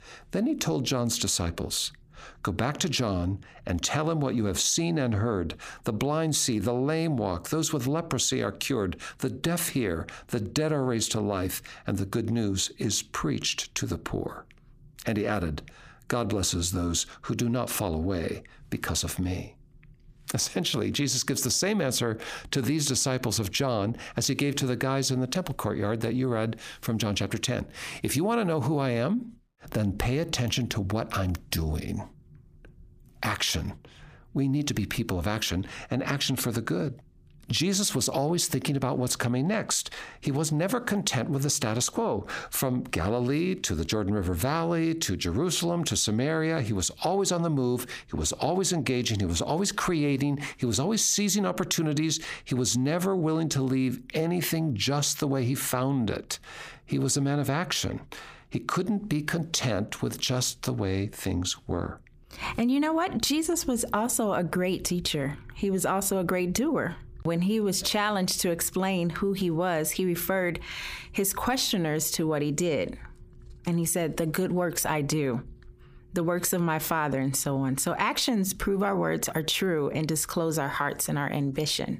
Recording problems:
squashed, flat; heavily

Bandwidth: 15 kHz